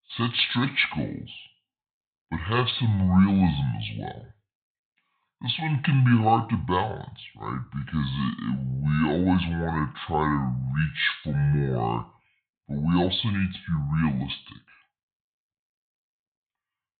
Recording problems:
high frequencies cut off; severe; nothing above 4 kHz
wrong speed and pitch; too slow and too low; 0.7 times normal speed

